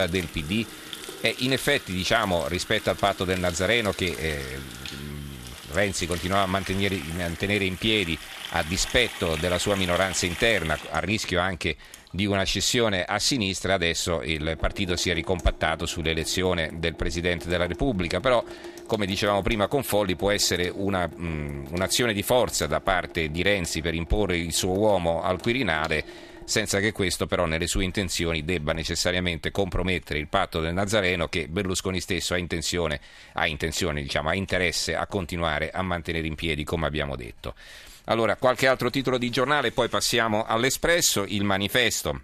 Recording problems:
household noises; noticeable; throughout; 15 dB below the speech
abrupt cut into speech; at the start

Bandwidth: 14 kHz